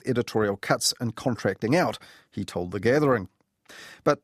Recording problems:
none

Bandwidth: 14.5 kHz